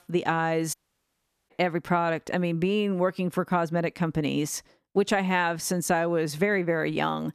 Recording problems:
audio cutting out; at 0.5 s for 1 s

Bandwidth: 14 kHz